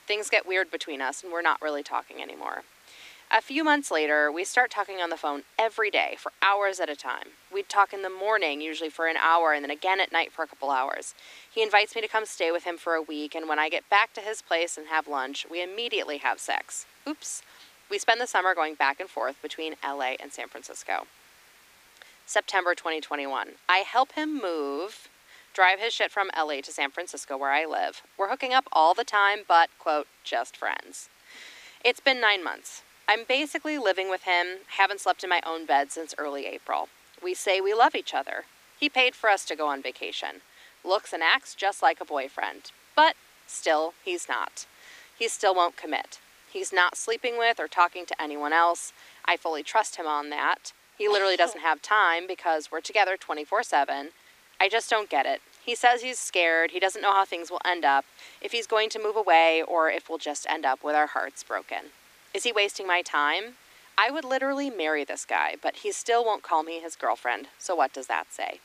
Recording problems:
thin; somewhat; fading below 300 Hz
hiss; faint; throughout; 30 dB below the speech

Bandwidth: 15 kHz